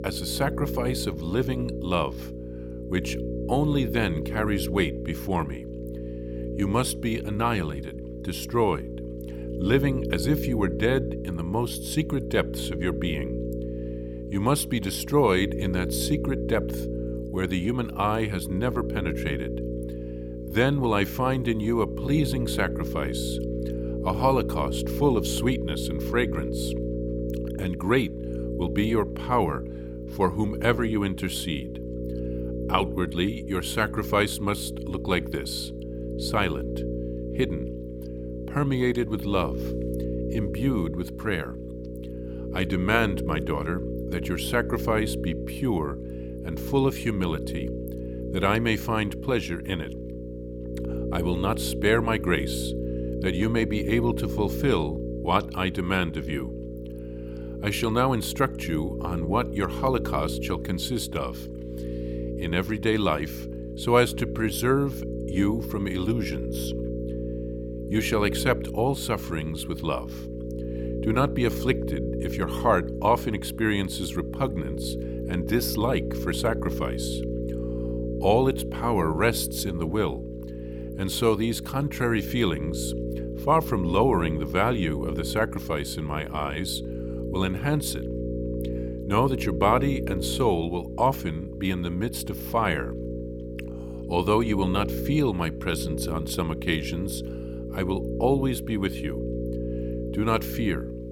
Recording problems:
electrical hum; loud; throughout; 60 Hz, 9 dB below the speech

